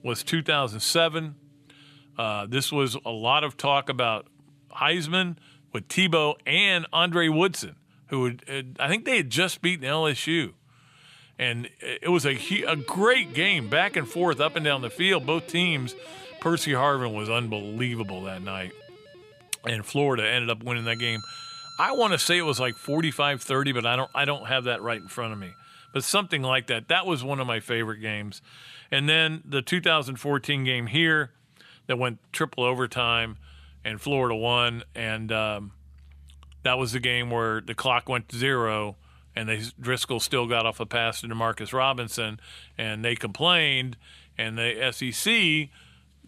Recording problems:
background music; faint; throughout; 20 dB below the speech

